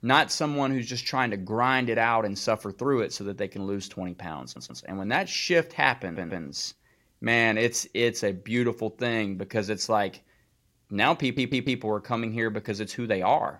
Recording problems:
audio stuttering; at 4.5 s, at 6 s and at 11 s

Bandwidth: 16 kHz